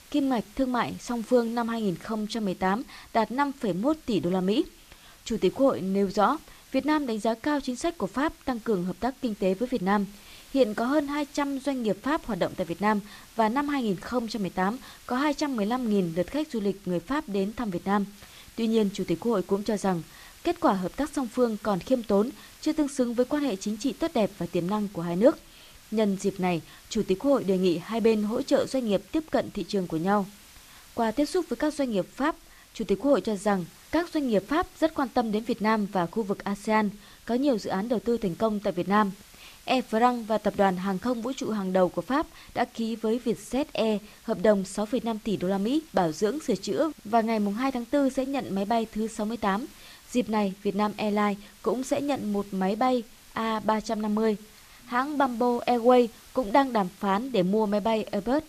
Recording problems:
hiss; faint; throughout; 25 dB below the speech

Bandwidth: 14.5 kHz